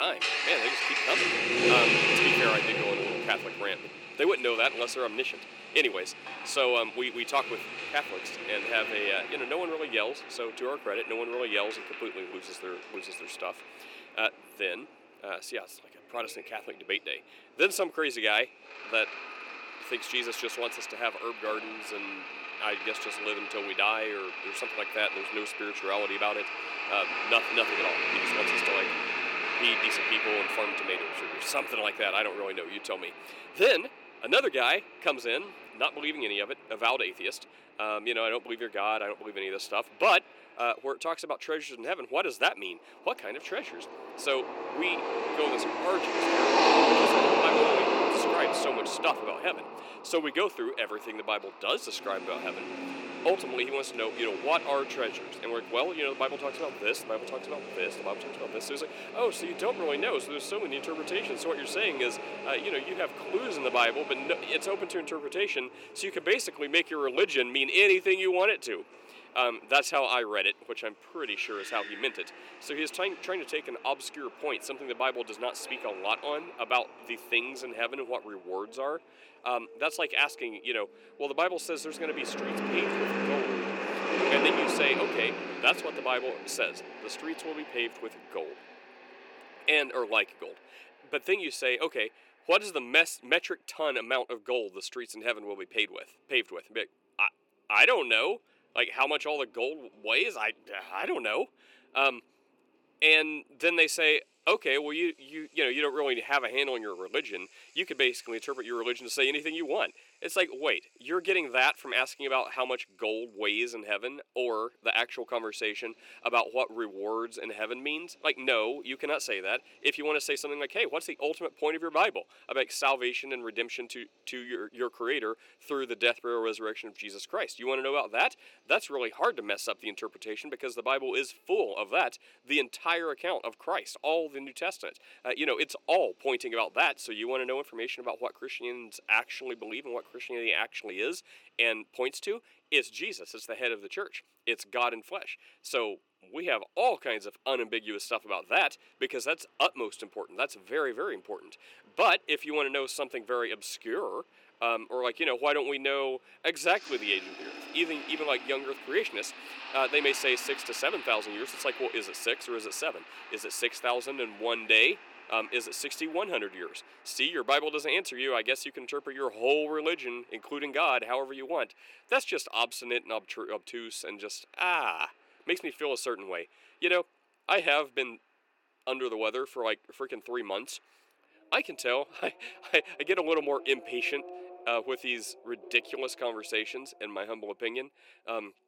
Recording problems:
thin; somewhat; fading below 350 Hz
traffic noise; loud; throughout; 2 dB below the speech
background music; faint; until 1:23; 30 dB below the speech
abrupt cut into speech; at the start

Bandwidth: 17 kHz